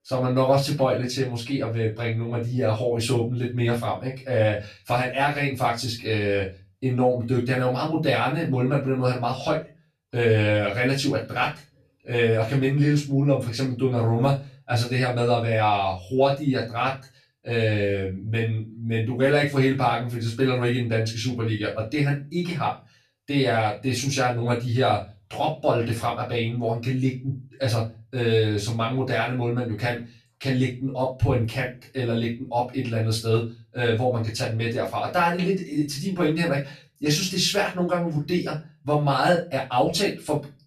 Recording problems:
off-mic speech; far
room echo; slight; dies away in 0.3 s

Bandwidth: 14 kHz